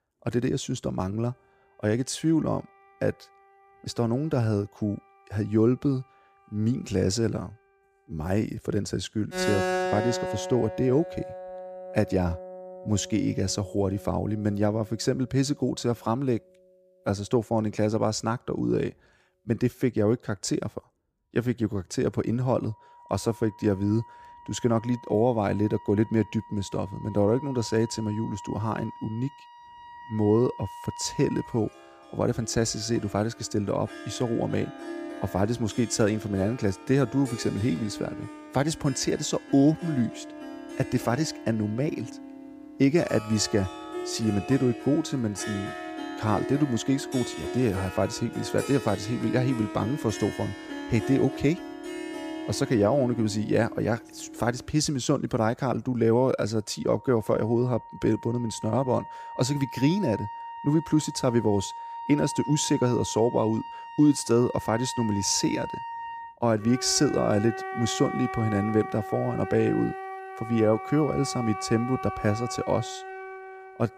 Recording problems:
background music; noticeable; throughout; 10 dB below the speech

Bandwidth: 15 kHz